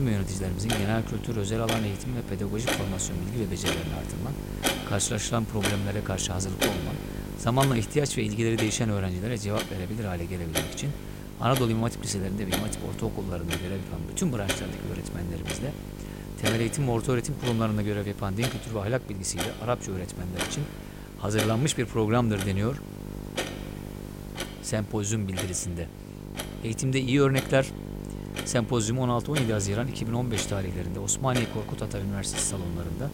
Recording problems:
household noises; loud; throughout; 7 dB below the speech
electrical hum; noticeable; throughout; 50 Hz, 15 dB below the speech
abrupt cut into speech; at the start

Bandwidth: 16 kHz